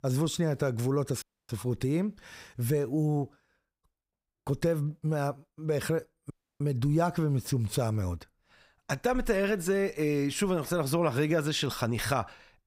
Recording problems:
audio cutting out; at 1 s and at 6.5 s

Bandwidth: 15.5 kHz